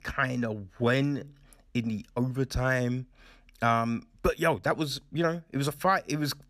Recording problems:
uneven, jittery; strongly; from 1 to 6 s

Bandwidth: 14.5 kHz